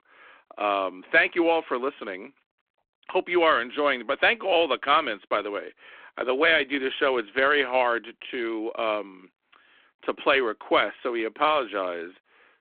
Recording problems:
phone-call audio

